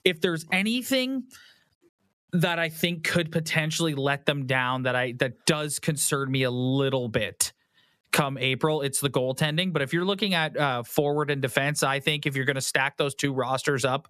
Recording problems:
squashed, flat; somewhat

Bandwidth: 14 kHz